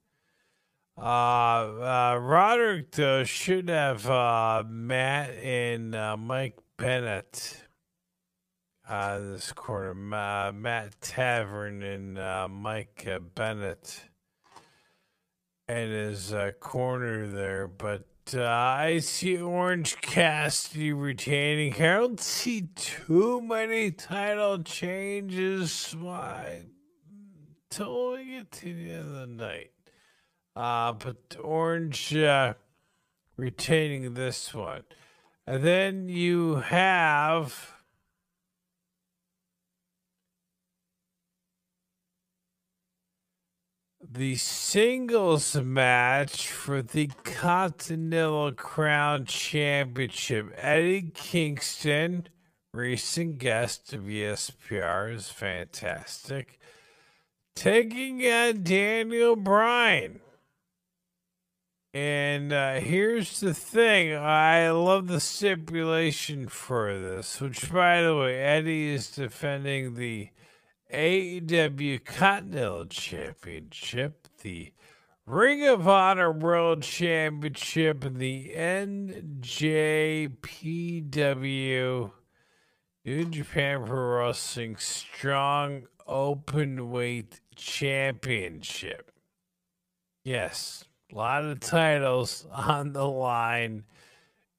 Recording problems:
wrong speed, natural pitch; too slow; 0.5 times normal speed

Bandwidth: 15 kHz